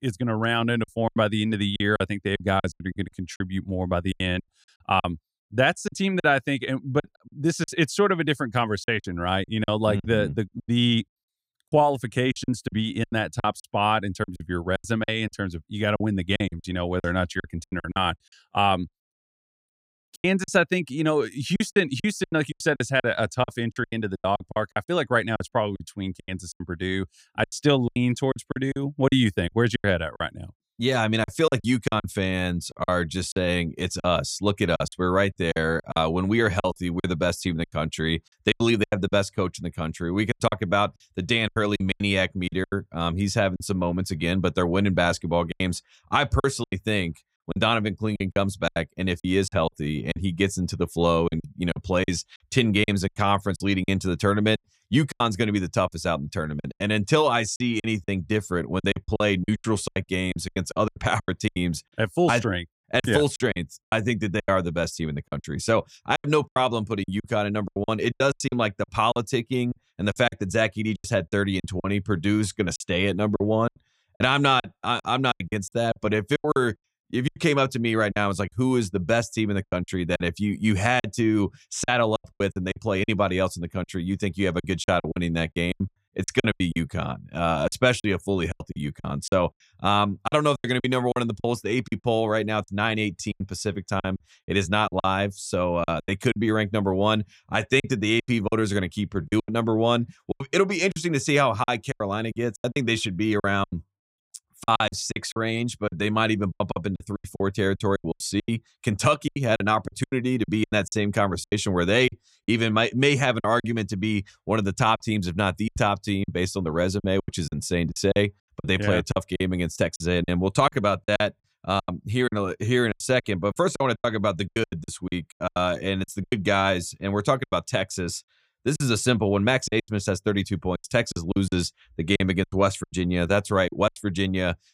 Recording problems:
choppy; very; 13% of the speech affected

